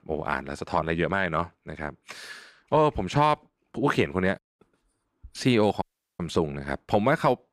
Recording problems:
audio cutting out; at 6 s

